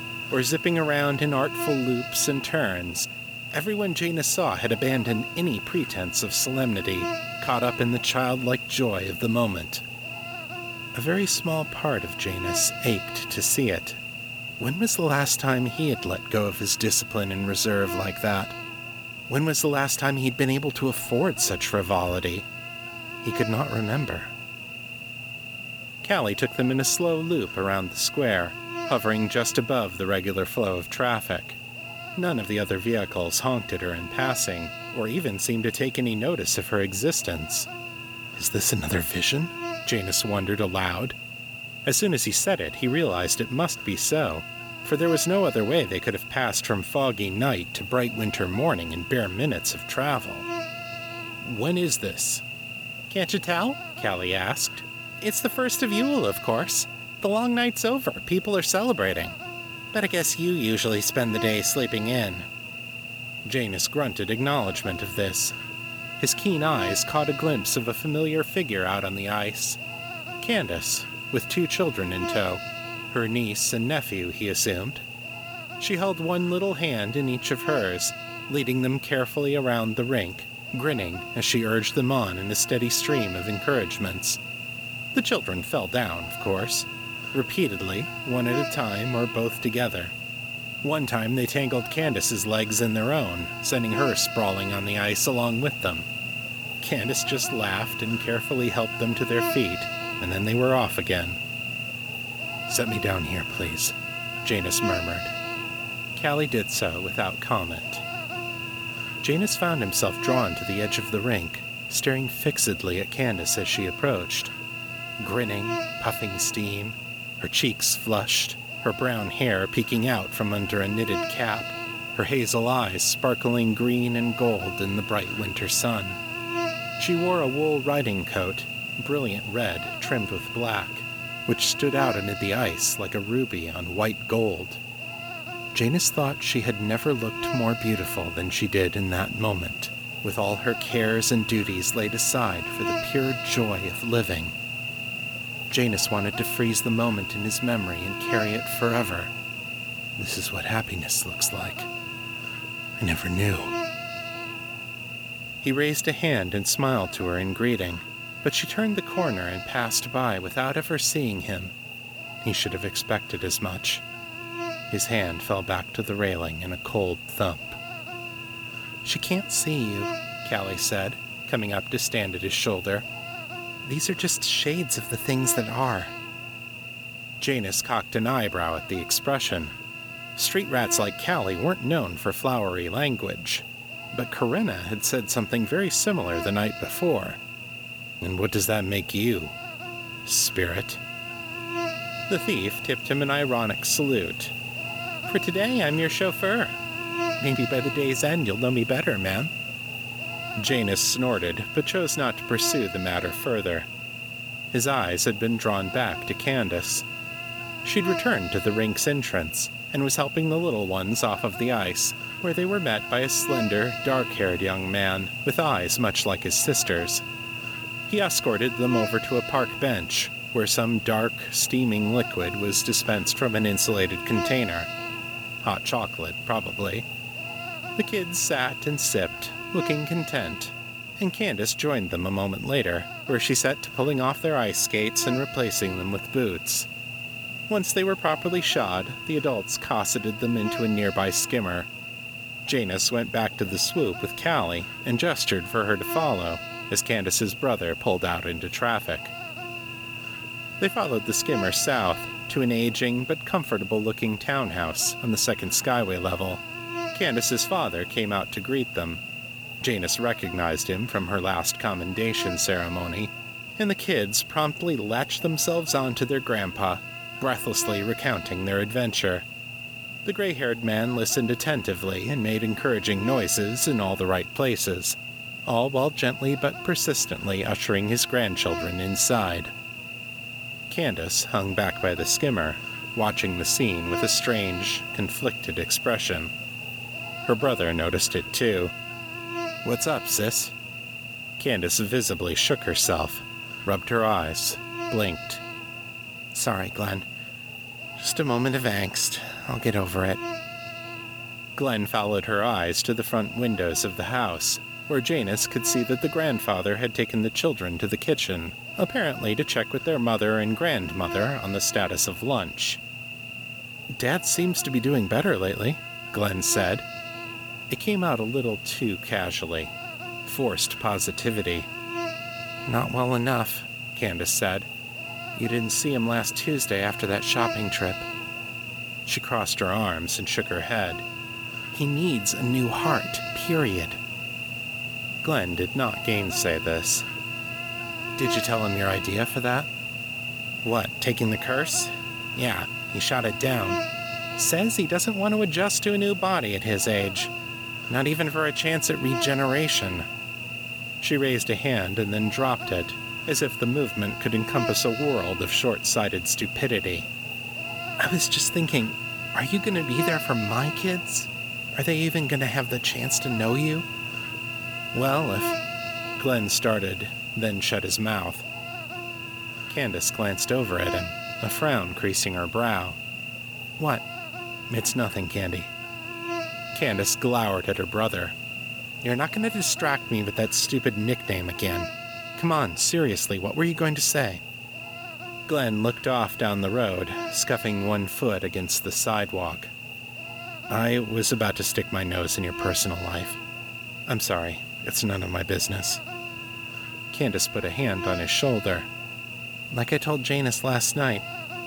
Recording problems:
electrical hum; loud; throughout; 60 Hz, 5 dB below the speech

